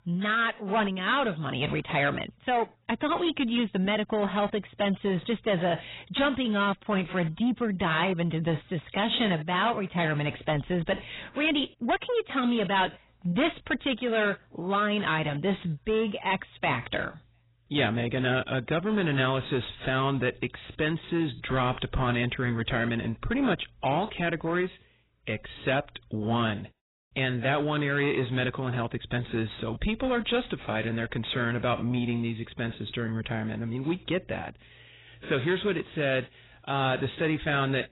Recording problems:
garbled, watery; badly; nothing above 4 kHz
distortion; slight; 10 dB below the speech

